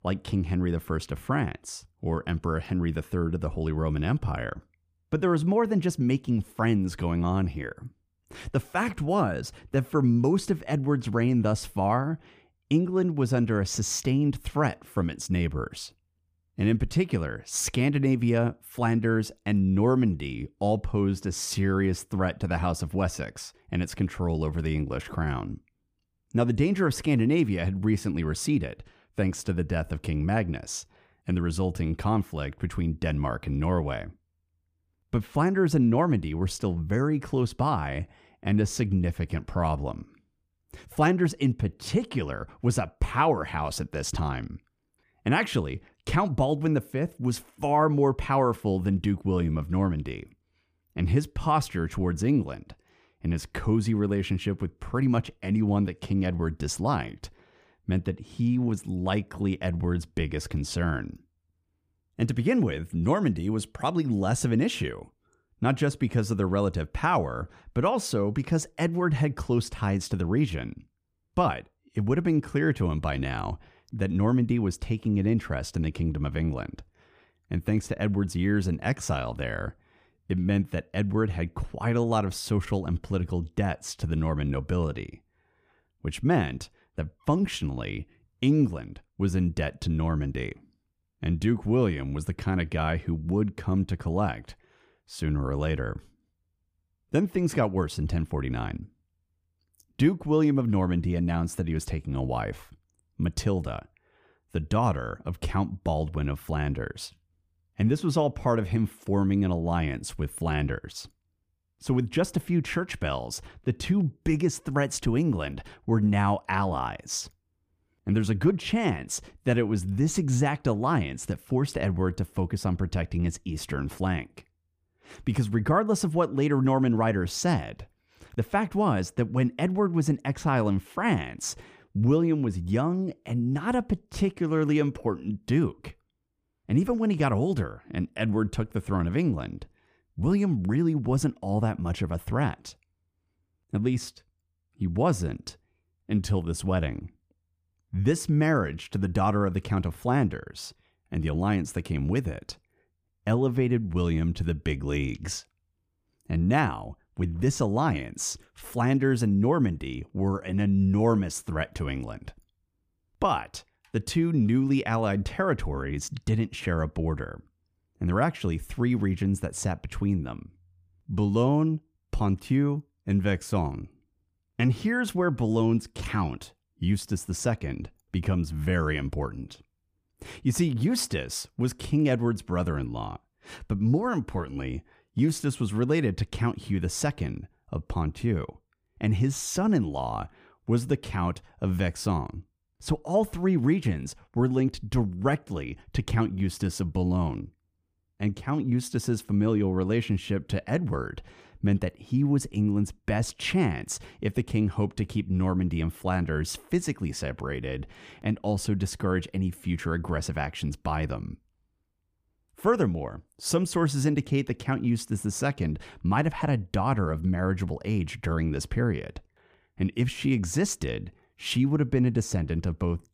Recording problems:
none

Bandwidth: 15 kHz